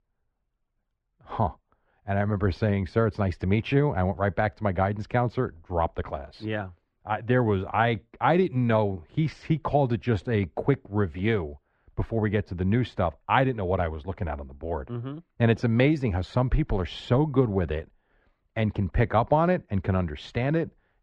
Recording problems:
muffled; very; fading above 2 kHz

